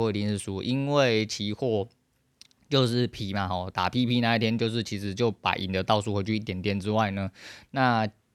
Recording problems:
abrupt cut into speech; at the start

